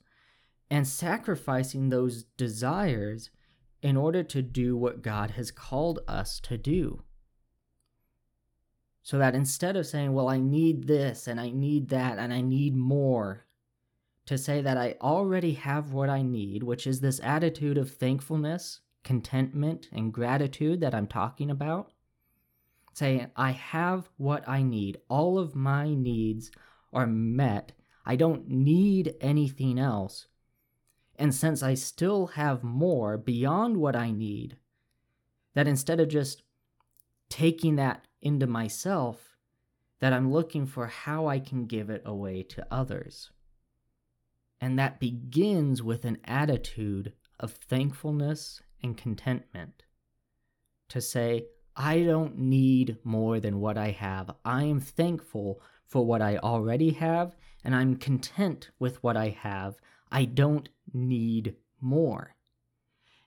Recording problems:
none

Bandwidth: 18 kHz